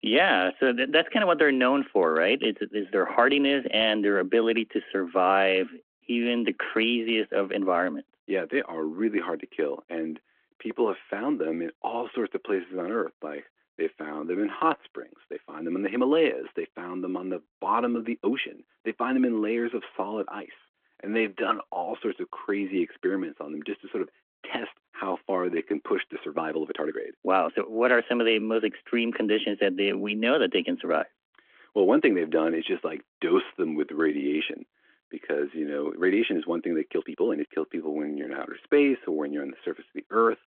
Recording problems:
phone-call audio
uneven, jittery; strongly; from 5.5 to 39 s

